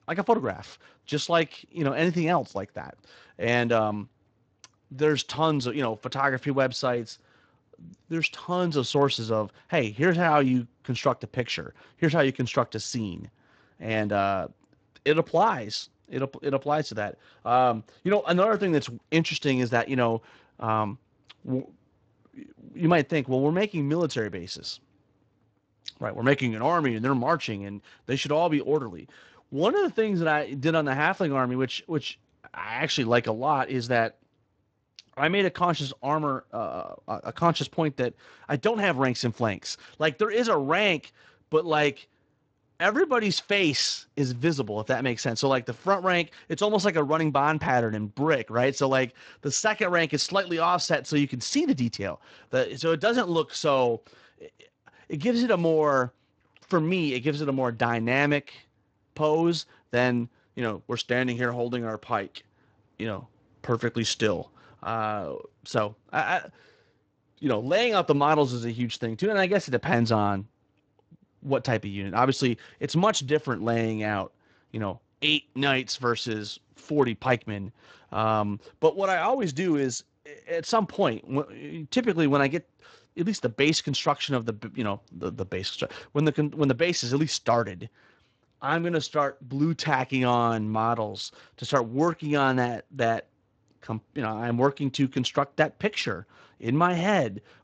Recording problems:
garbled, watery; slightly; nothing above 7.5 kHz

